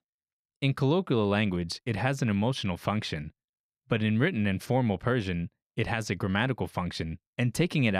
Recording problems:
abrupt cut into speech; at the end

